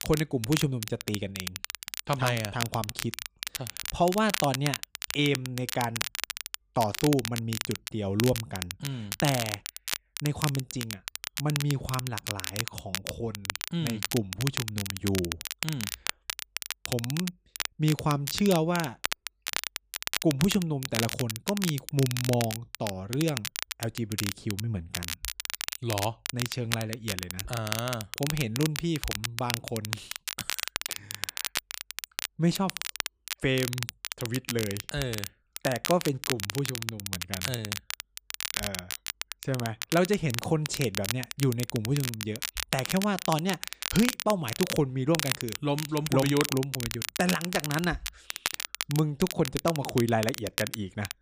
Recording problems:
crackle, like an old record; loud; 4 dB below the speech

